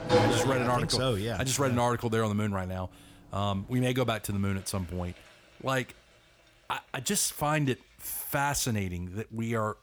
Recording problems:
household noises; loud; throughout; 3 dB below the speech

